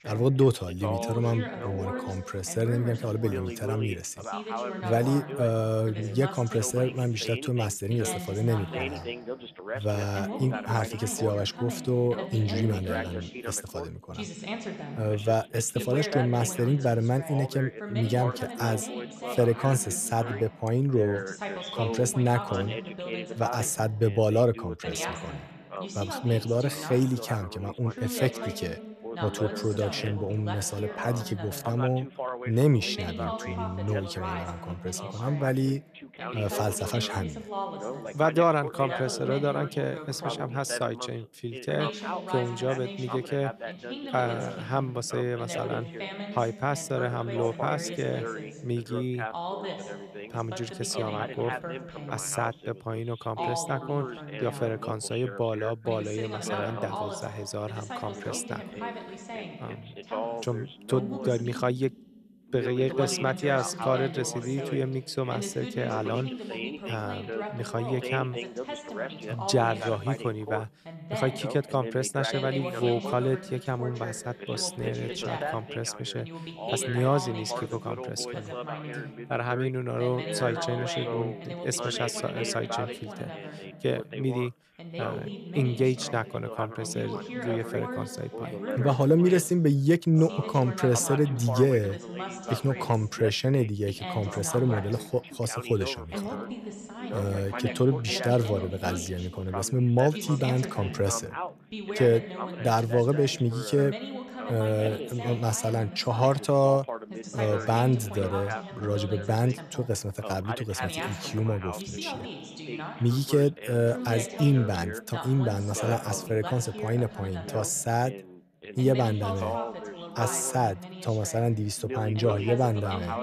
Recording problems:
background chatter; loud; throughout; 2 voices, 8 dB below the speech

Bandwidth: 14.5 kHz